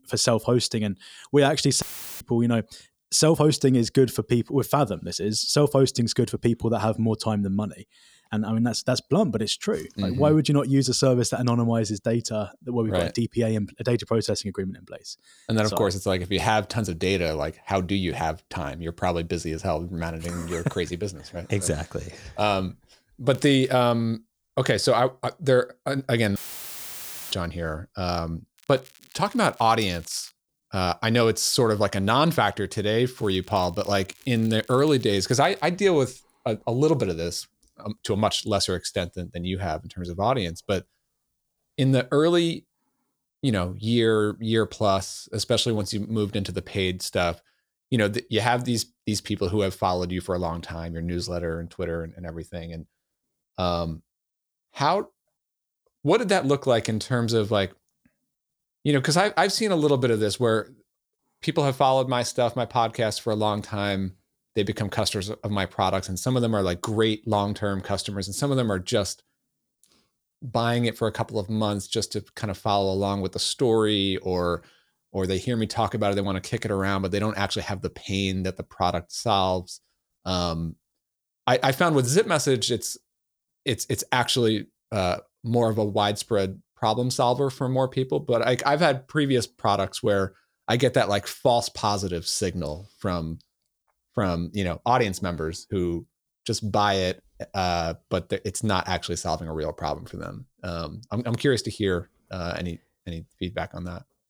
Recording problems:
crackling; faint; at 23 s, from 29 to 30 s and from 33 to 36 s; 25 dB below the speech
audio cutting out; filled with static; at 2 s and at 26 s for 1 s

